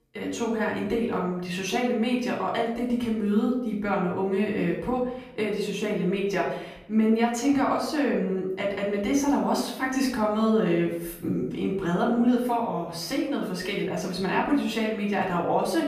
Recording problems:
off-mic speech; far
room echo; noticeable; dies away in 0.7 s

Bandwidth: 14.5 kHz